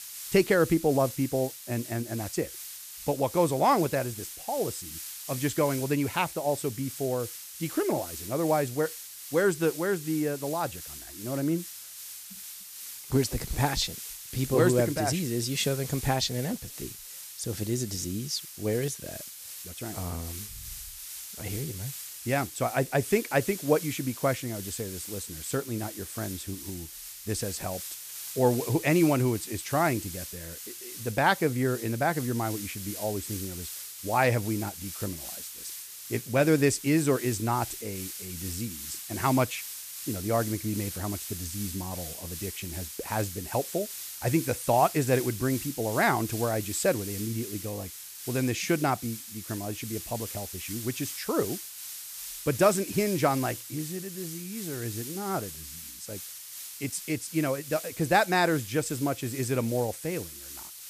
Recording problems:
hiss; loud; throughout; 9 dB below the speech

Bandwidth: 14.5 kHz